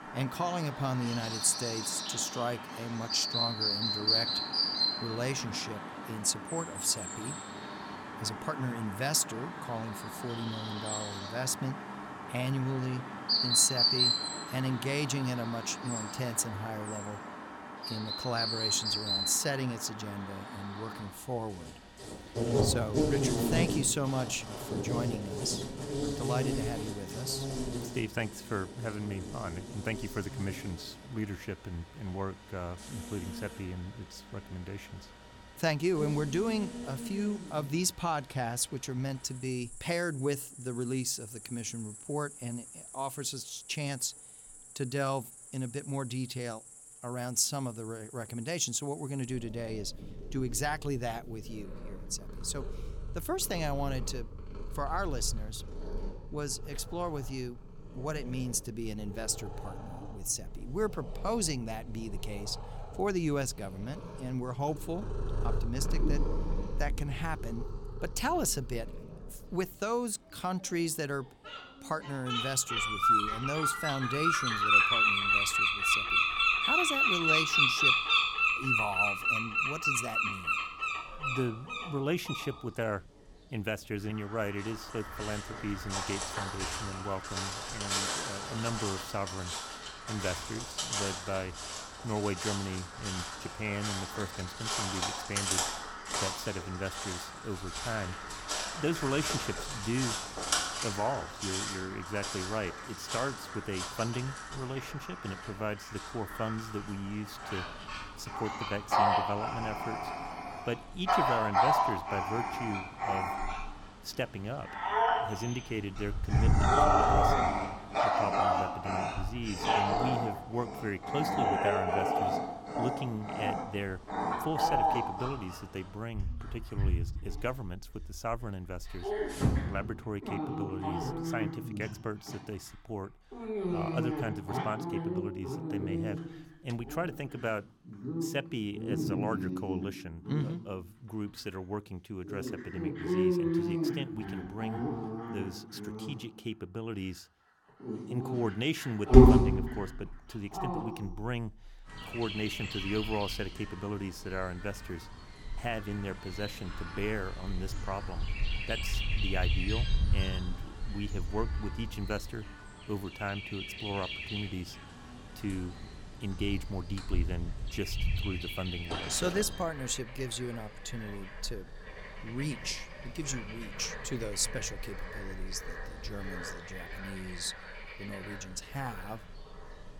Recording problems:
animal sounds; very loud; throughout; 4 dB above the speech

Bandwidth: 17.5 kHz